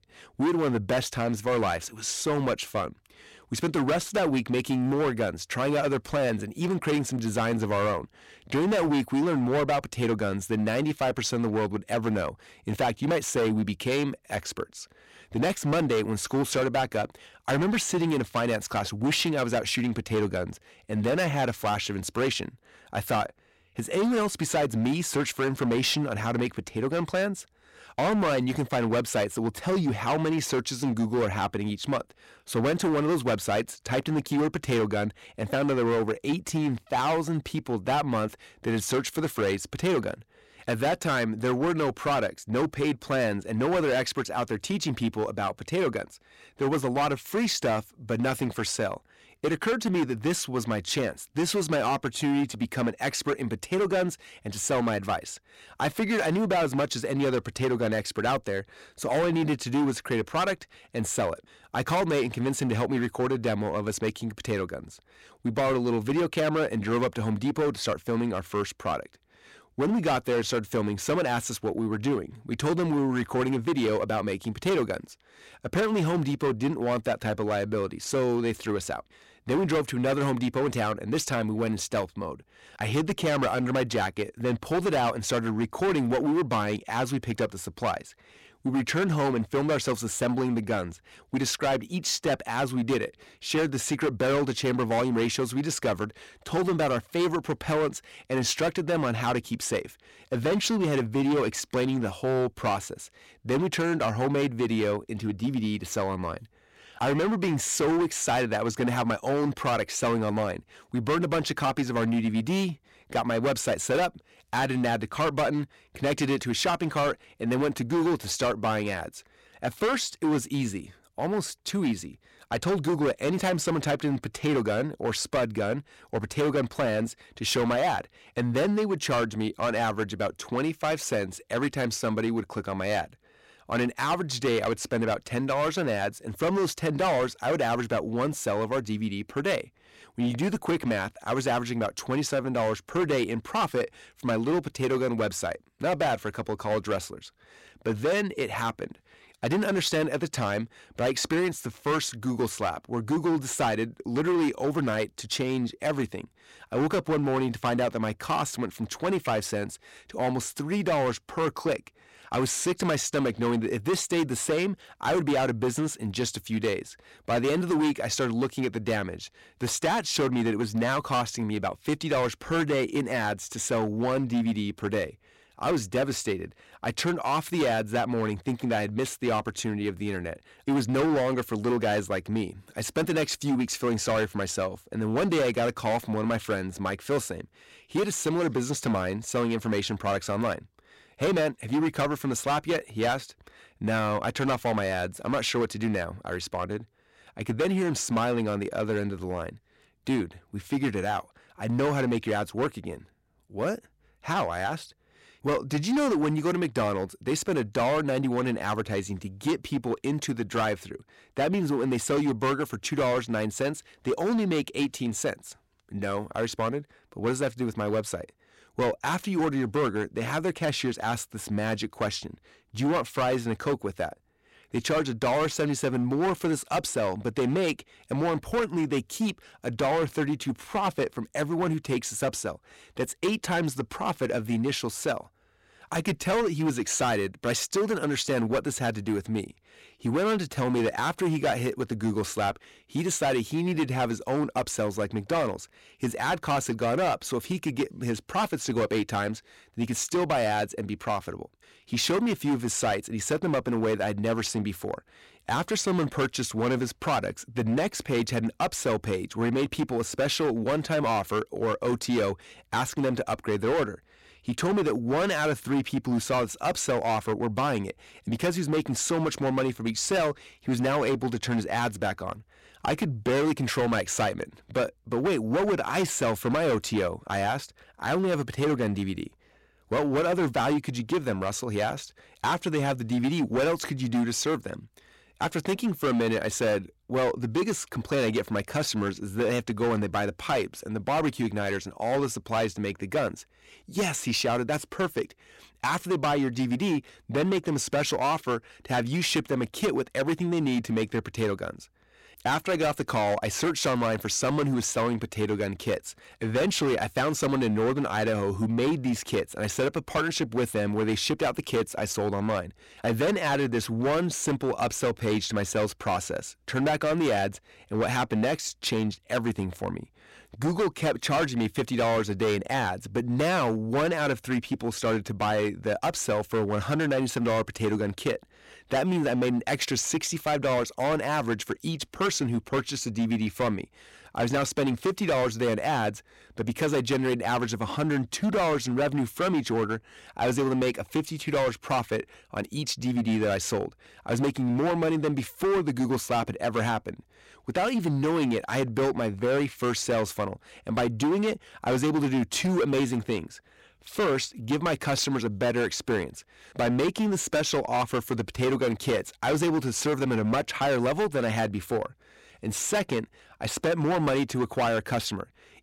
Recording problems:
distortion; heavy; 13% of the sound clipped

